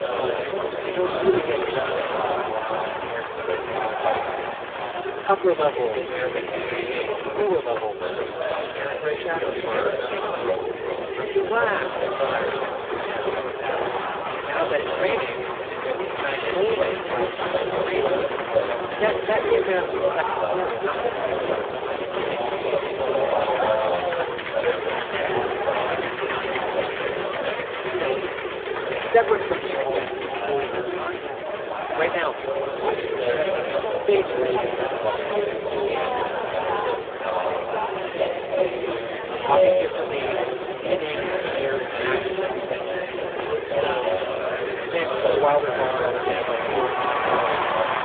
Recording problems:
phone-call audio; poor line
chatter from many people; very loud; throughout; 2 dB above the speech
hiss; very faint; from 17 s on; 25 dB below the speech

